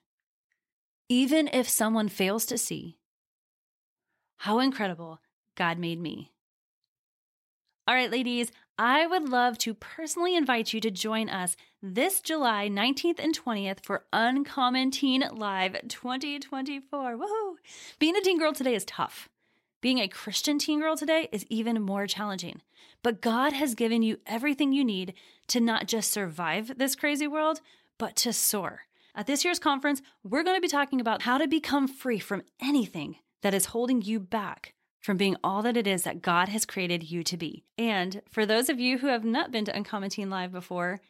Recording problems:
none

